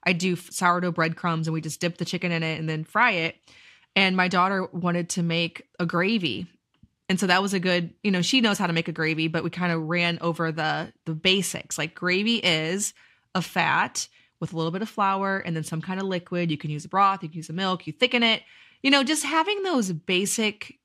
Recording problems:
none

